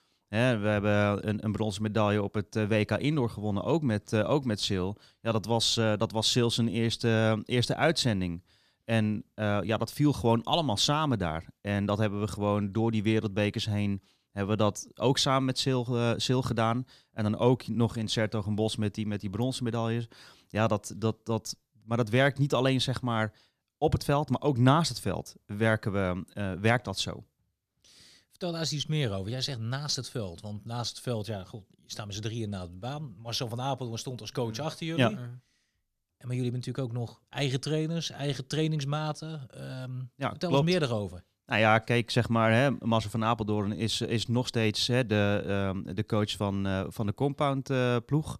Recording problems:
none

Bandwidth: 14.5 kHz